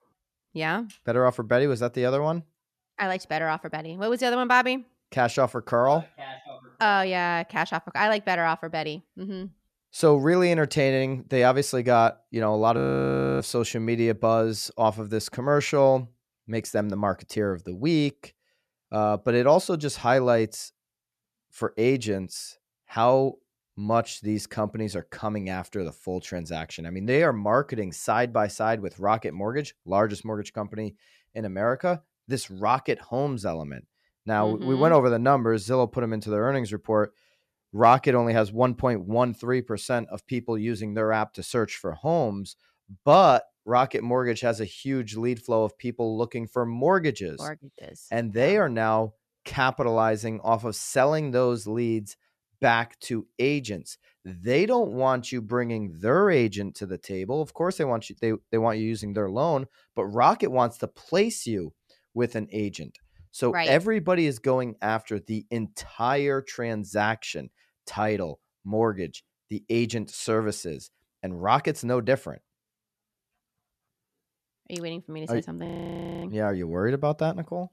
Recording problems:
audio freezing; at 13 s for 0.5 s and at 1:16 for 0.5 s

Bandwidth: 14 kHz